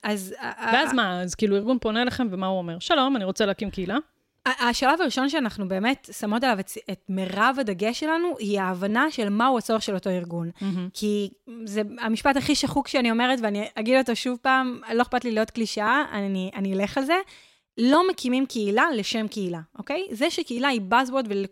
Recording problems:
none

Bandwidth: 16 kHz